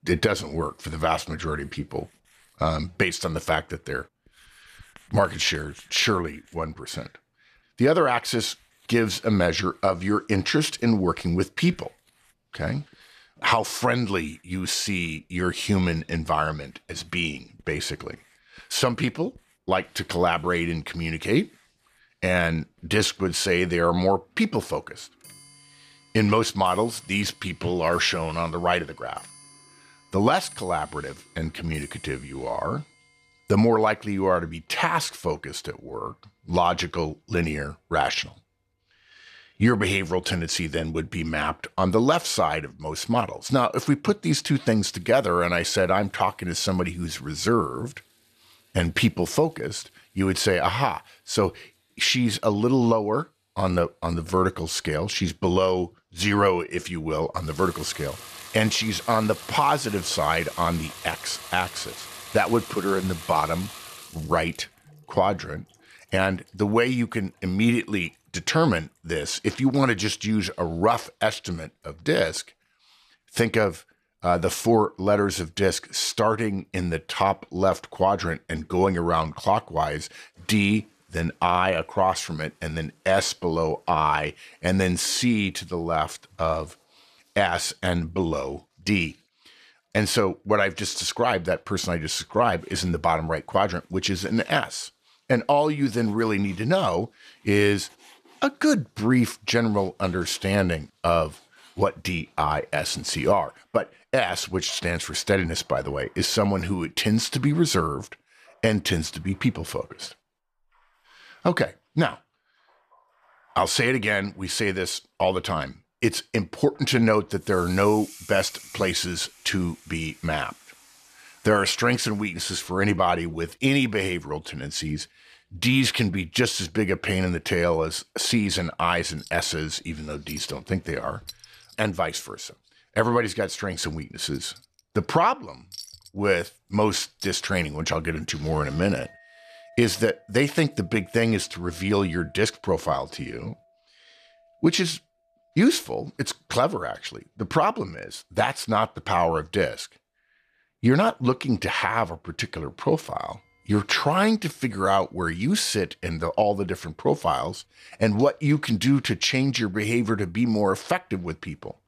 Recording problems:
household noises; faint; throughout; 20 dB below the speech

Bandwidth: 14 kHz